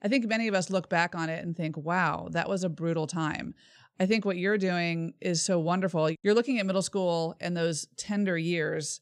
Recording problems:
none

